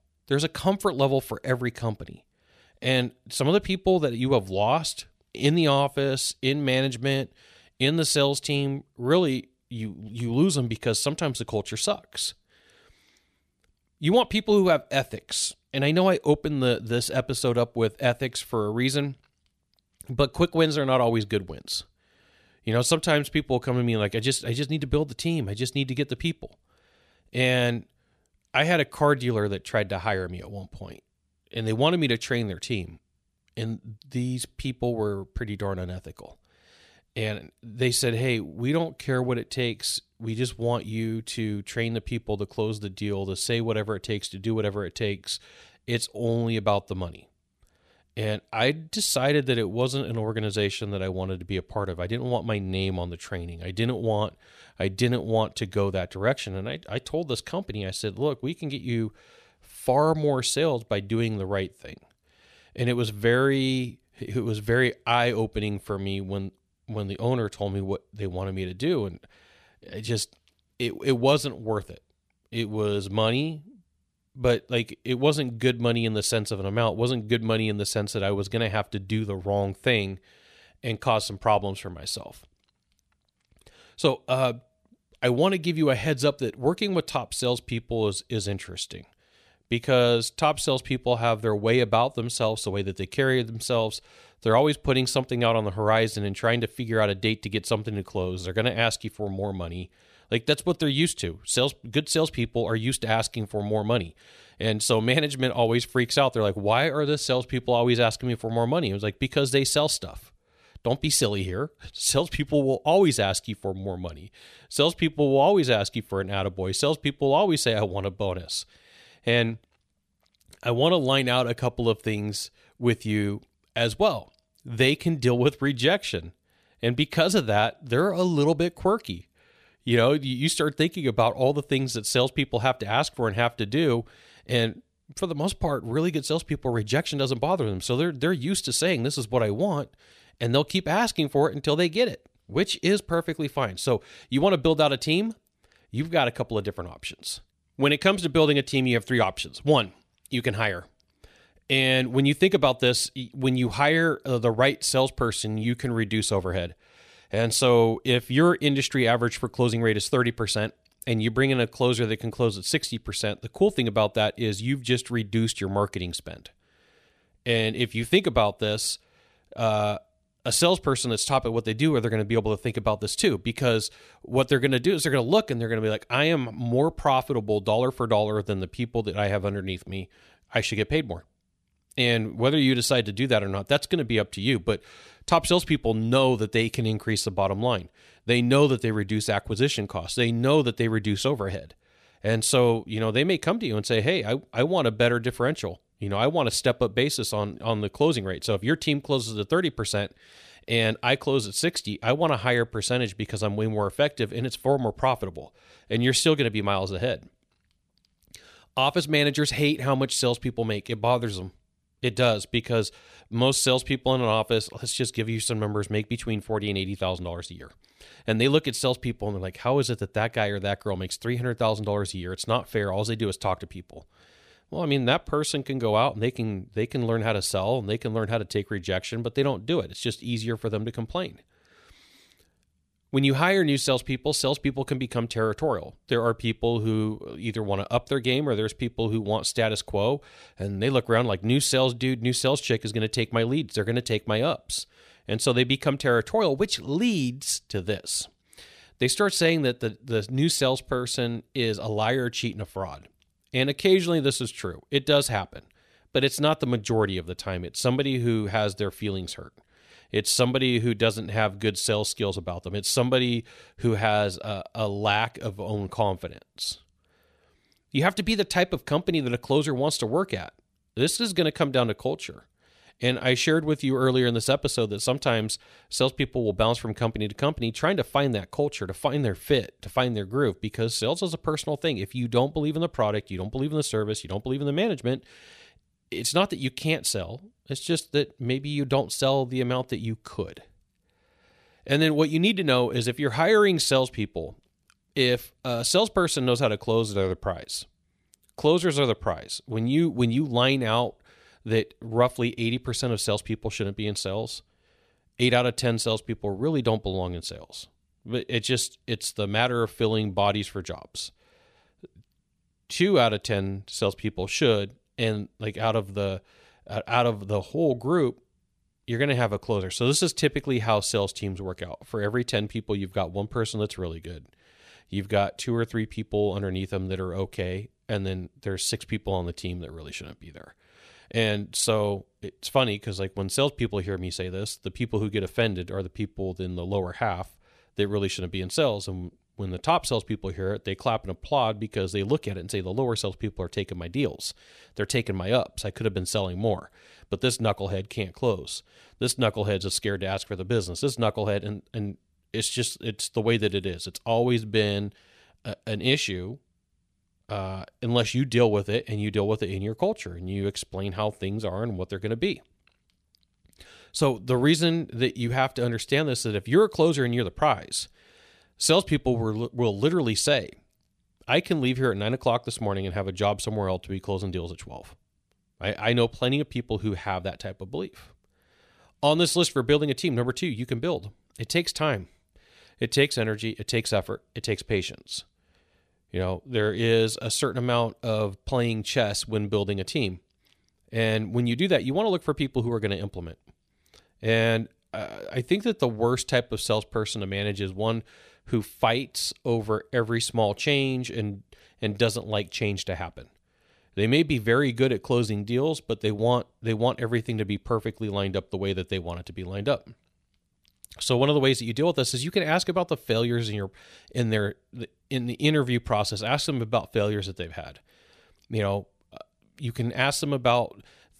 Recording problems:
none

